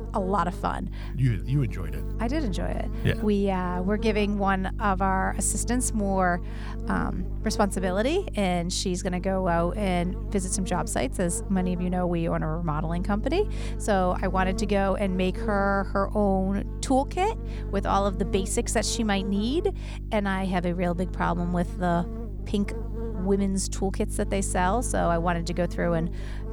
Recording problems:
electrical hum; noticeable; throughout; 50 Hz, 15 dB below the speech

